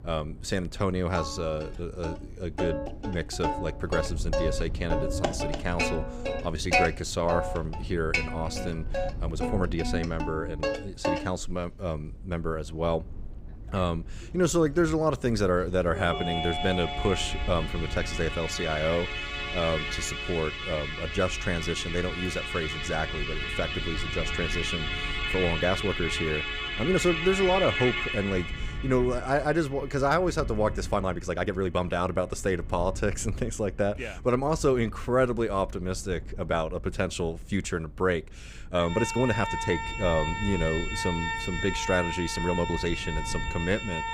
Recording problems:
background music; loud; throughout; 3 dB below the speech
low rumble; faint; throughout; 25 dB below the speech
uneven, jittery; strongly; from 5 to 43 s

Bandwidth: 15.5 kHz